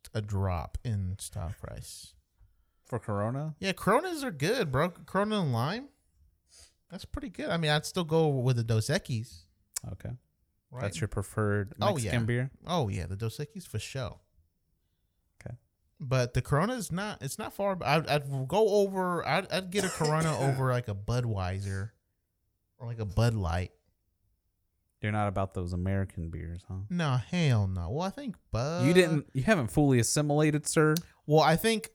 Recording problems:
none

